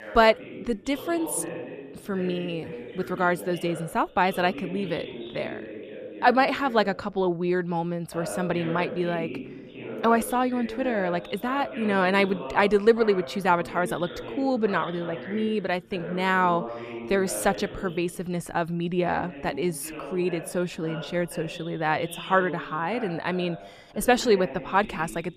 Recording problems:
voice in the background; noticeable; throughout; 10 dB below the speech

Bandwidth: 14.5 kHz